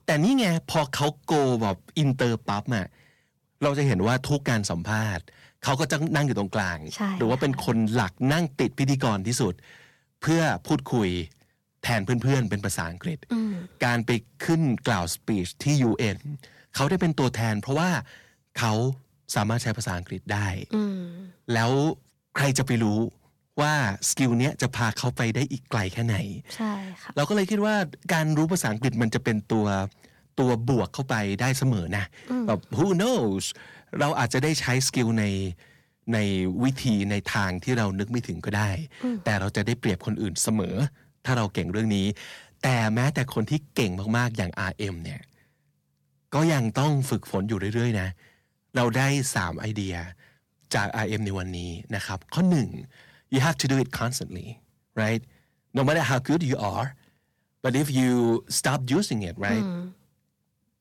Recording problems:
distortion; slight; 10 dB below the speech

